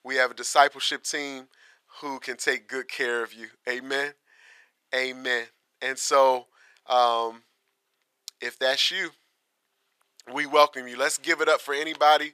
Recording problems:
thin; very; fading below 850 Hz

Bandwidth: 14.5 kHz